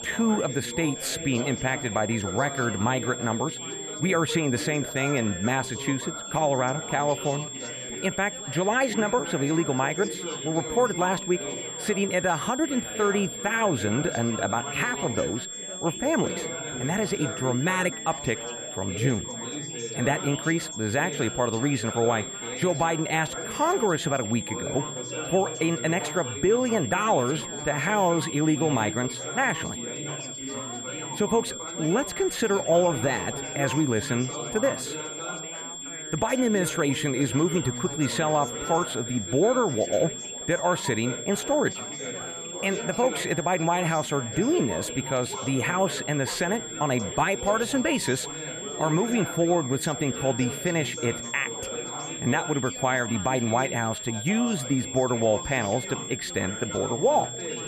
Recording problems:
high-pitched whine; loud; throughout; 7.5 kHz, 8 dB below the speech
chatter from many people; noticeable; throughout; 10 dB below the speech

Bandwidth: 14.5 kHz